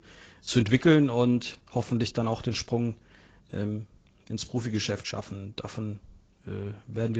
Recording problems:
garbled, watery; slightly; nothing above 7.5 kHz
abrupt cut into speech; at the end

